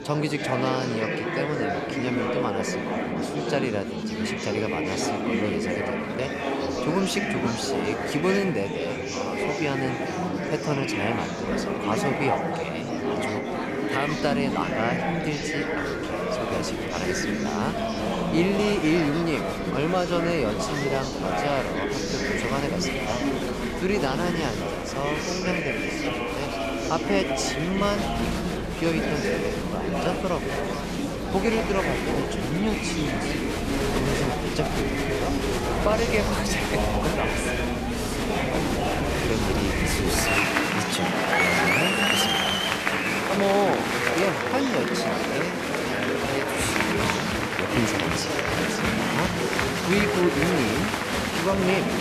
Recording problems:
murmuring crowd; very loud; throughout; 3 dB above the speech

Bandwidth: 14 kHz